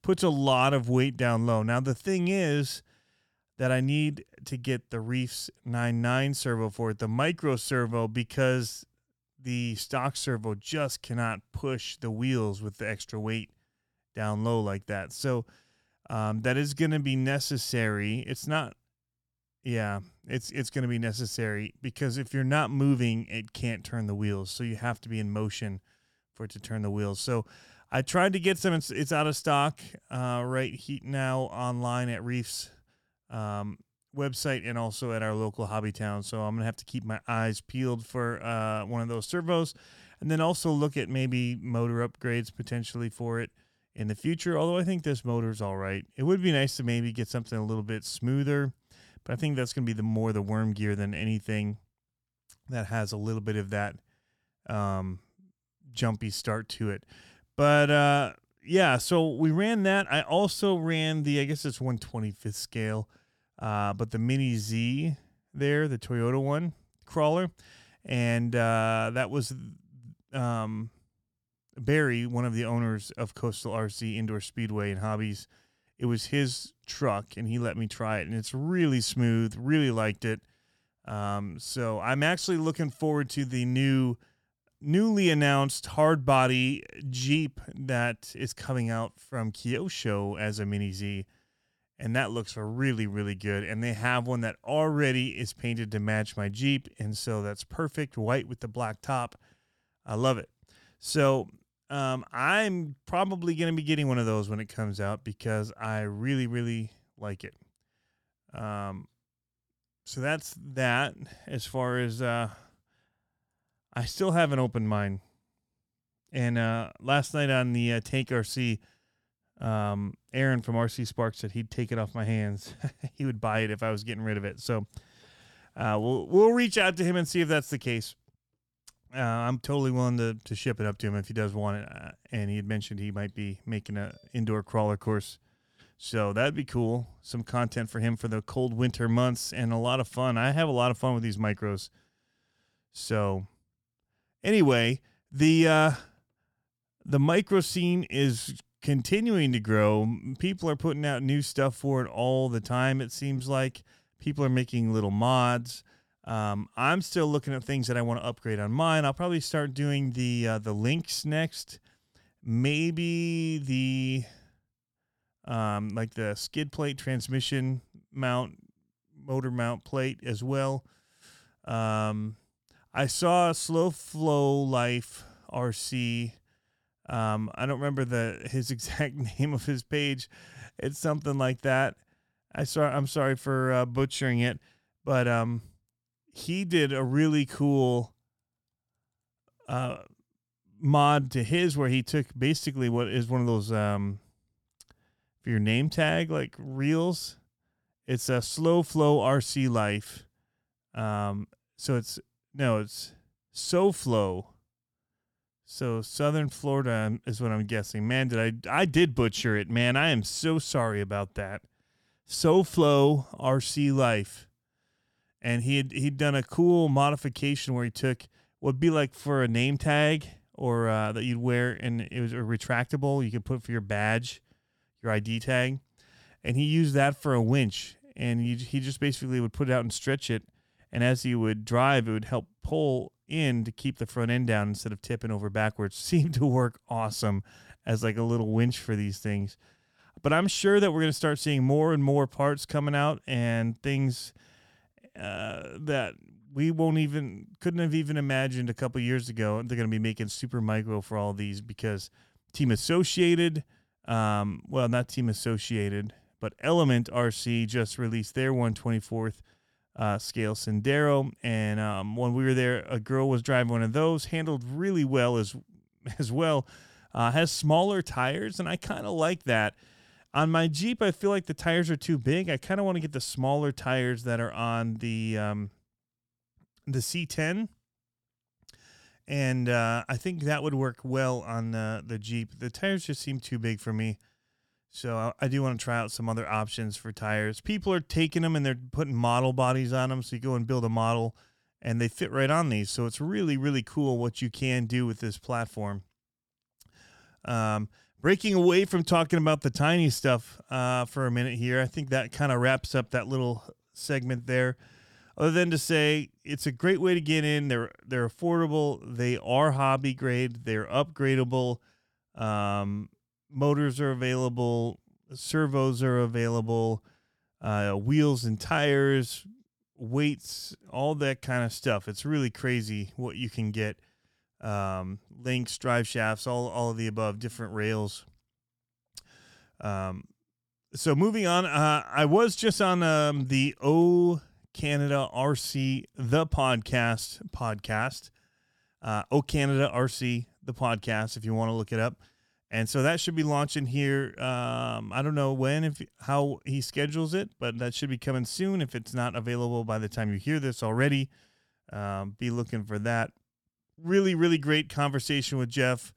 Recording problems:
none

